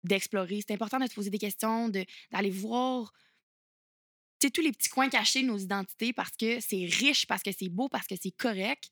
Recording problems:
thin; very slightly; fading below 250 Hz

